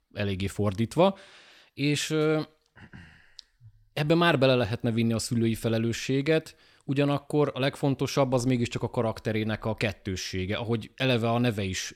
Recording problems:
none

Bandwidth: 16.5 kHz